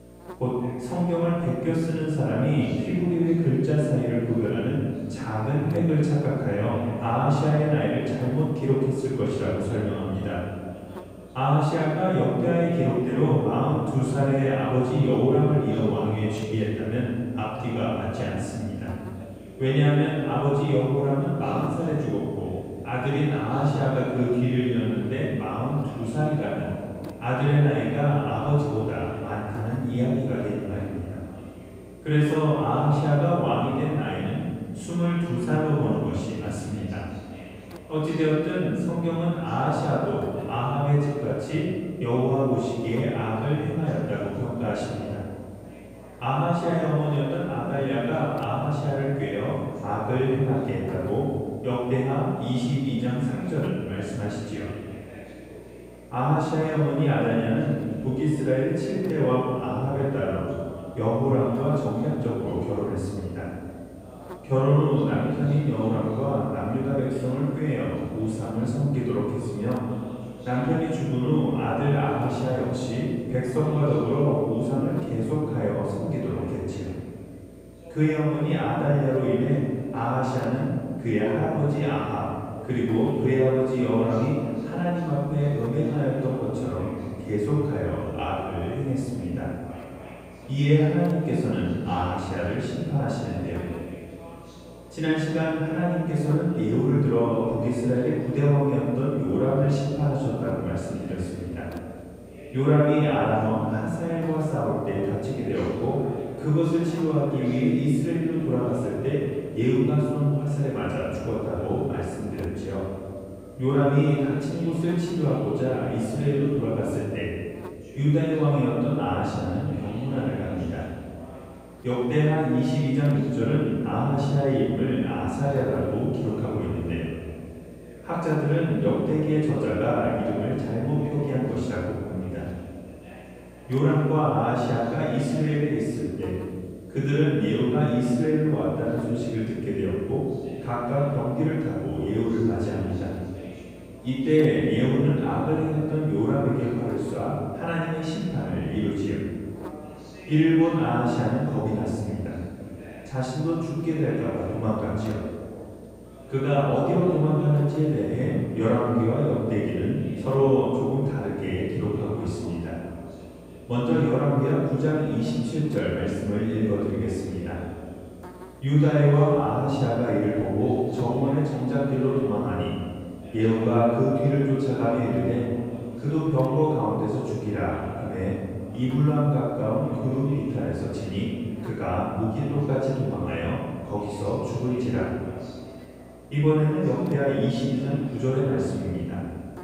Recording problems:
room echo; strong; dies away in 1.9 s
off-mic speech; far
electrical hum; faint; throughout; 60 Hz, 20 dB below the speech
voice in the background; faint; throughout; 25 dB below the speech

